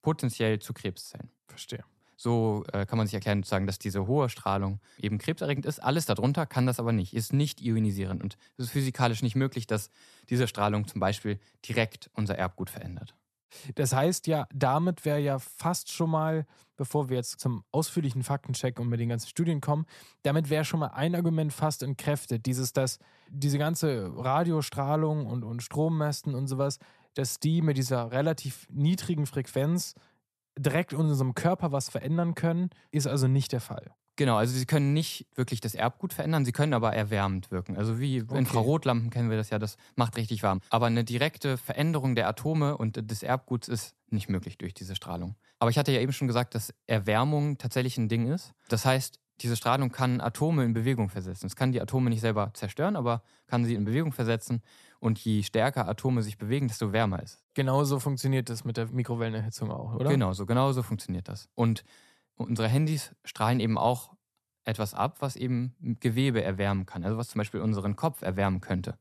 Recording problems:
none

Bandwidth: 13.5 kHz